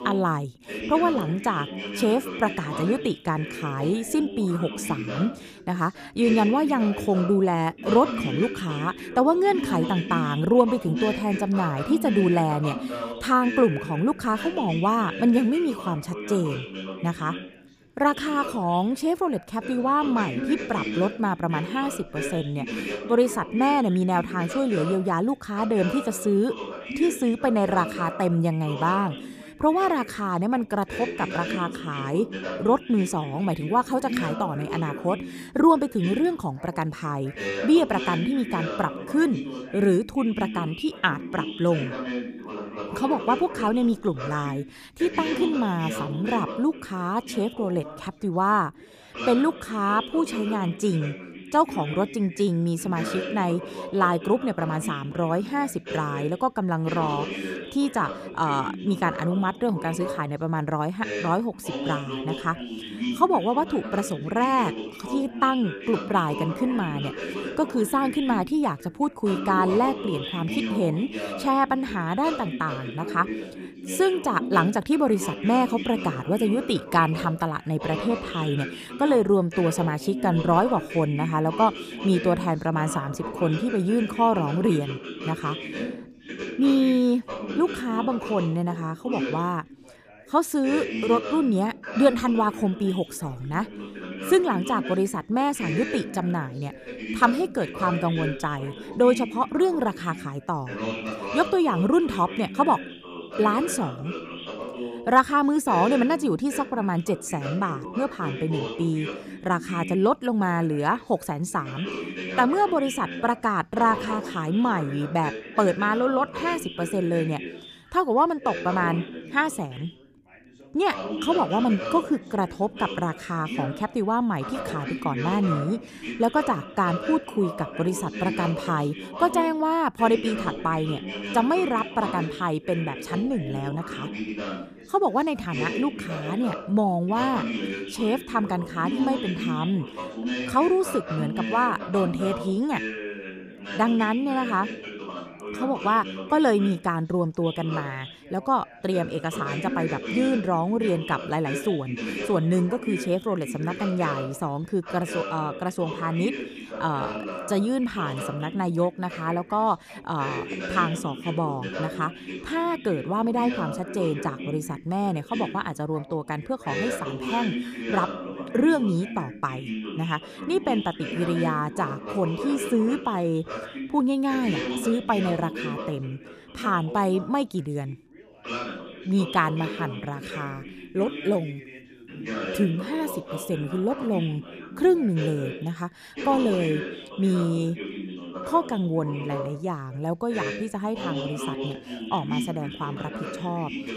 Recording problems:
background chatter; loud; throughout; 2 voices, 8 dB below the speech

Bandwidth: 15 kHz